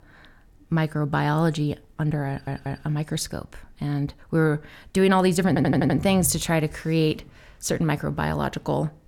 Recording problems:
audio stuttering; at 2.5 s and at 5.5 s

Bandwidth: 17.5 kHz